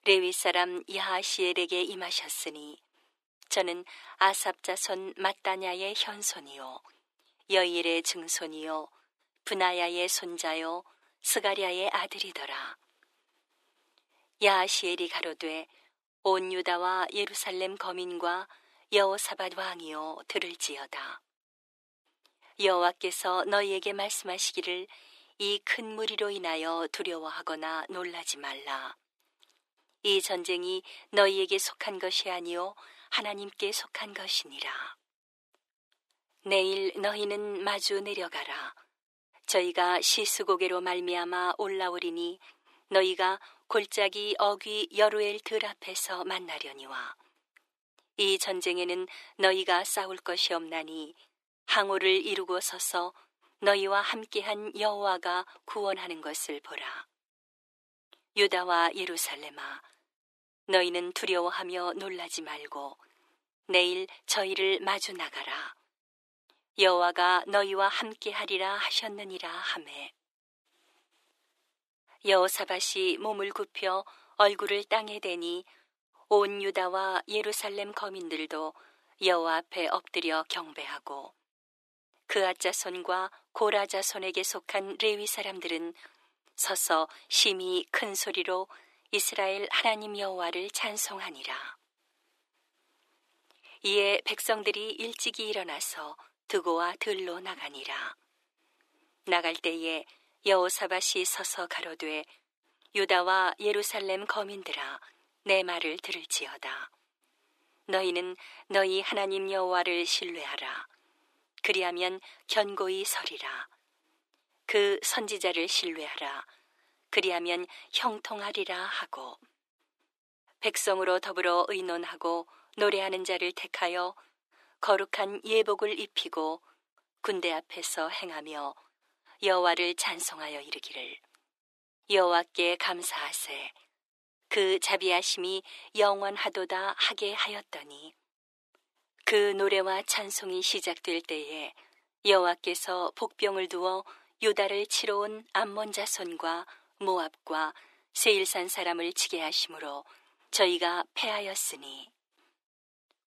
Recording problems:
thin; very; fading below 350 Hz

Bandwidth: 13.5 kHz